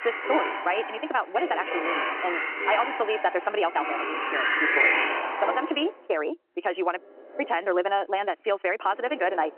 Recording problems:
wrong speed, natural pitch; too fast; 1.6 times normal speed
phone-call audio; nothing above 3 kHz
household noises; very loud; throughout; 1 dB above the speech

